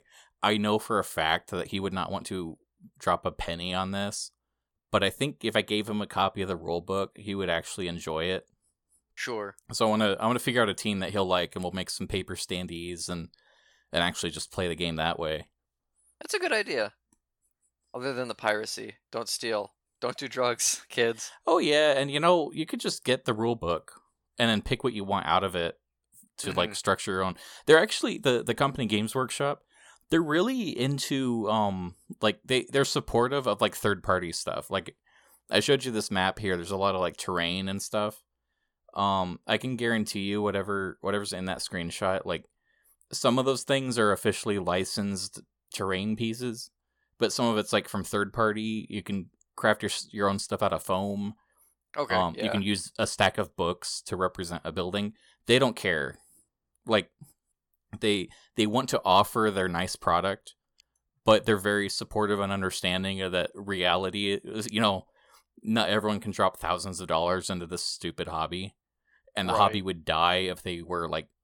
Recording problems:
none

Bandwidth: 17.5 kHz